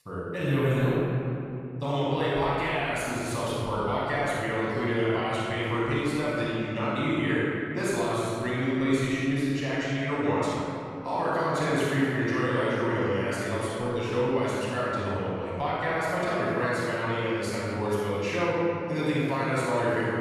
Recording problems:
room echo; strong; dies away in 2.7 s
off-mic speech; far

